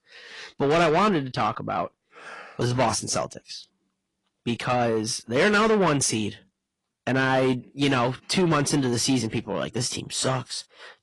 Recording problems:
distortion; heavy; 8 dB below the speech
garbled, watery; slightly; nothing above 10.5 kHz

